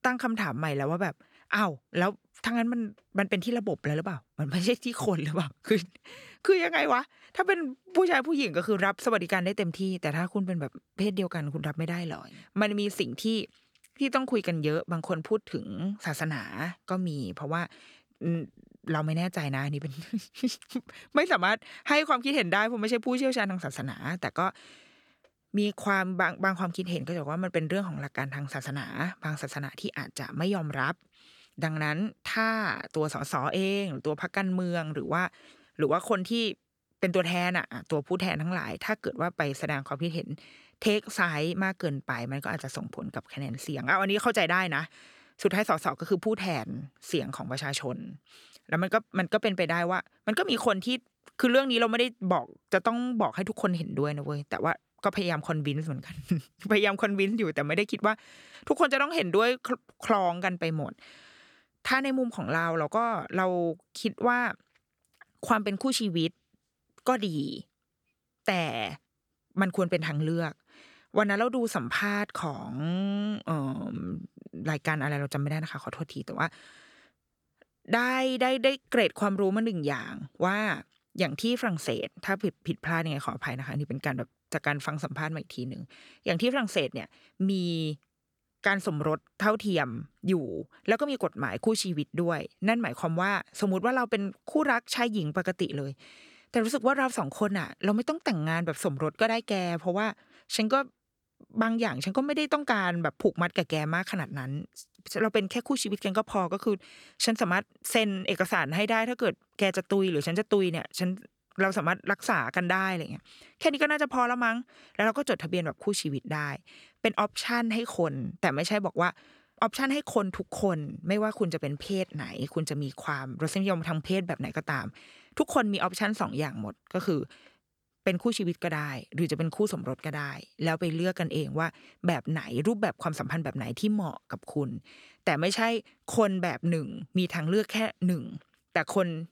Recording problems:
none

